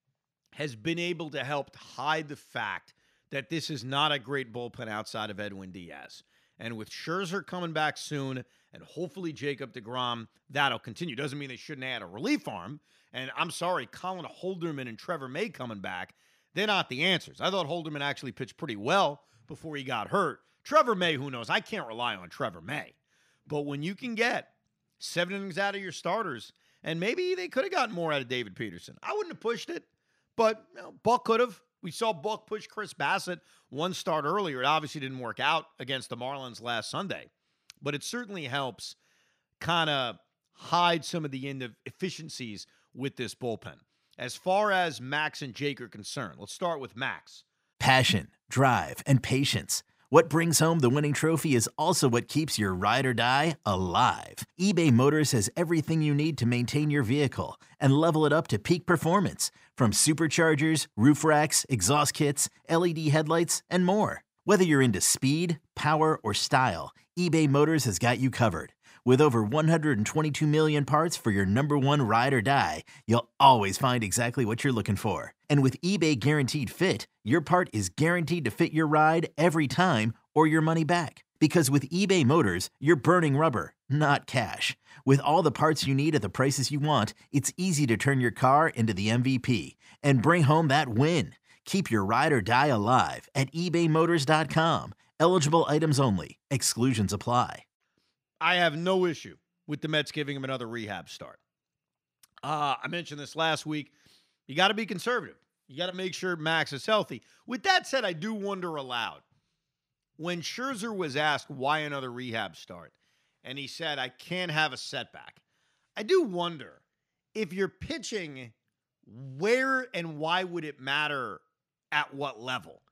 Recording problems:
none

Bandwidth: 15.5 kHz